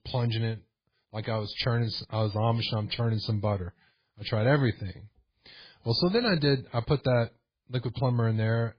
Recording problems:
garbled, watery; badly; nothing above 4.5 kHz

